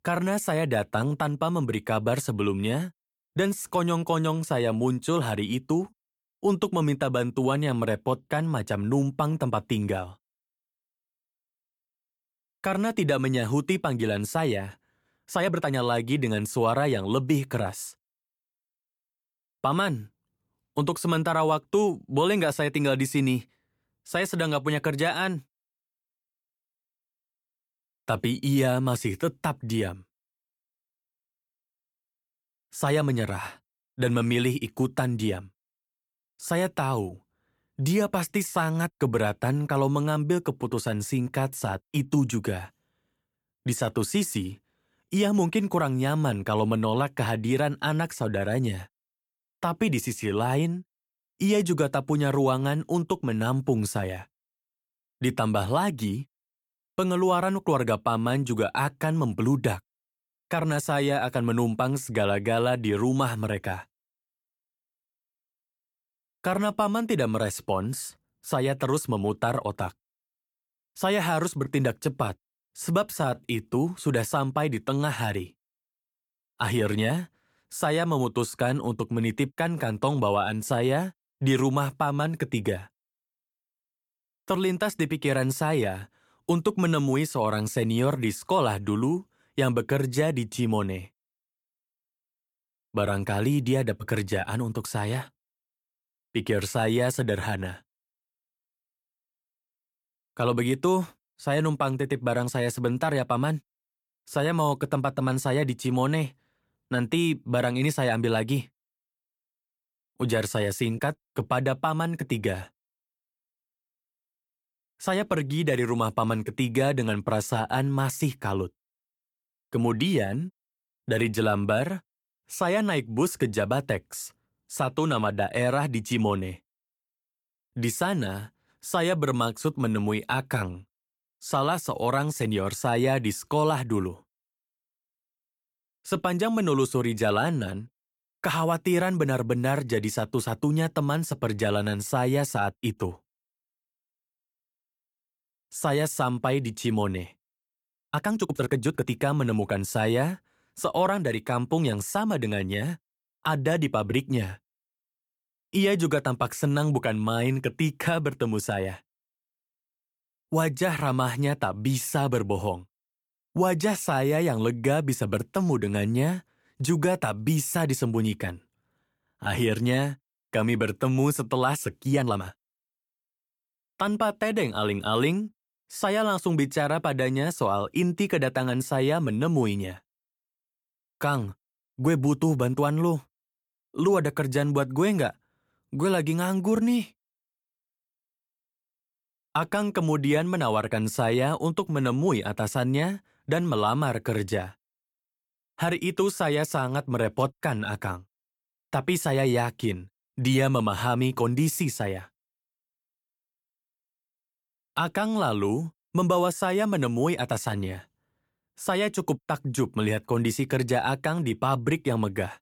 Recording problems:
uneven, jittery; strongly; from 15 s to 2:53

